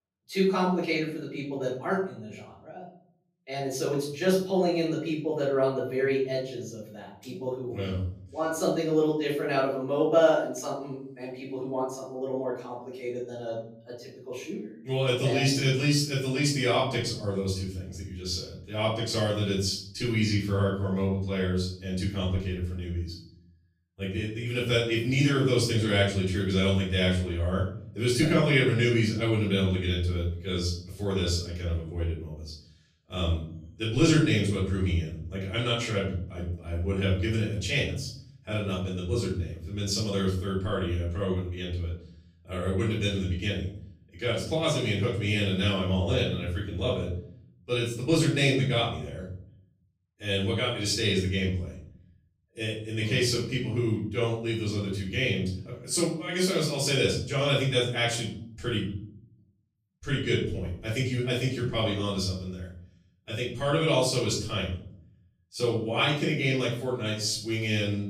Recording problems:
off-mic speech; far
room echo; noticeable; dies away in 0.7 s

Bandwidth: 15 kHz